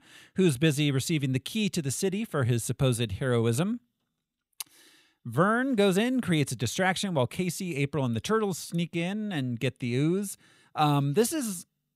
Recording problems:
none

